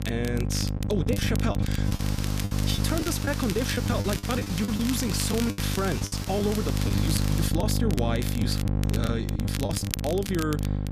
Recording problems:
electrical hum; loud; throughout; 50 Hz, 7 dB below the speech
hiss; loud; from 2 to 7.5 s; 8 dB below the speech
crackle, like an old record; loud; 10 dB below the speech
choppy; very; 10% of the speech affected

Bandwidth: 14.5 kHz